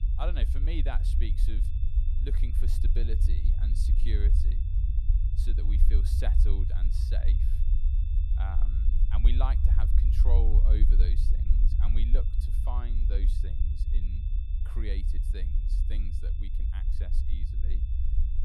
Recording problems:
low rumble; loud; throughout; 4 dB below the speech
high-pitched whine; noticeable; throughout; 3.5 kHz, 20 dB below the speech

